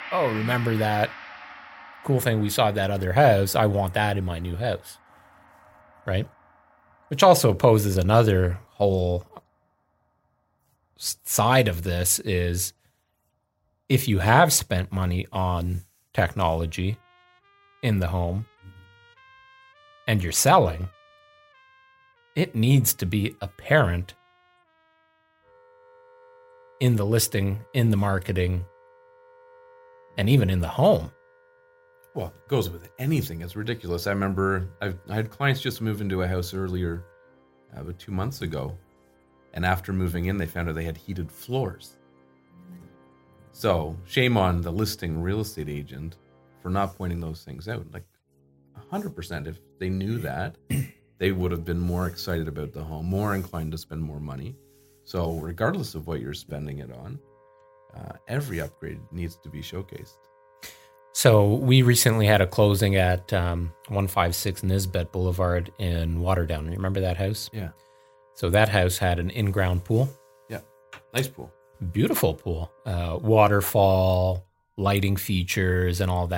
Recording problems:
background music; faint; throughout; 25 dB below the speech
abrupt cut into speech; at the end

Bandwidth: 16 kHz